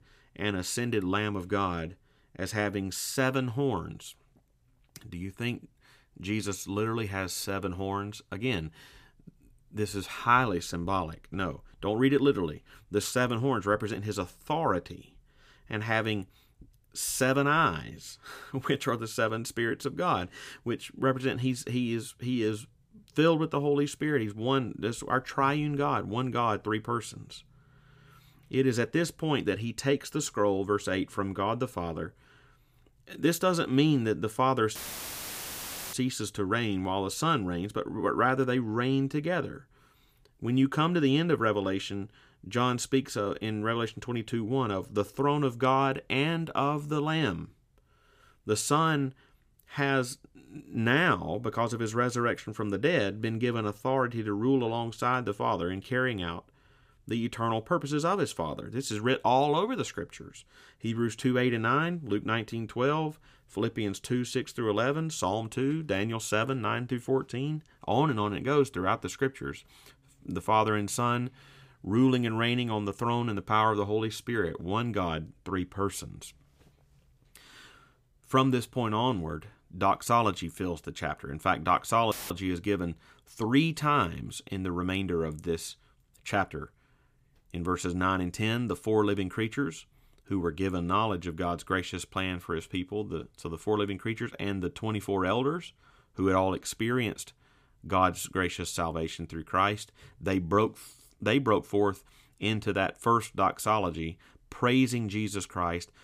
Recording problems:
audio cutting out; filled with static; at 35 s for 1 s and at 1:22

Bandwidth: 15 kHz